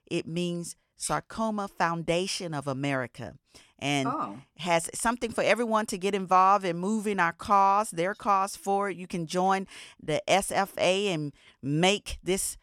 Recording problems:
none

